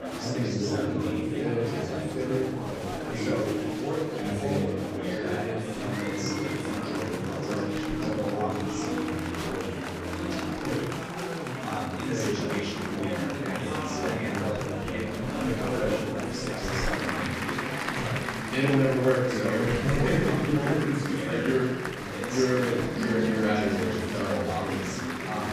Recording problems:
room echo; strong; dies away in 0.9 s
off-mic speech; far
murmuring crowd; very loud; throughout; as loud as the speech
background music; loud; throughout; 7 dB below the speech

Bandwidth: 15 kHz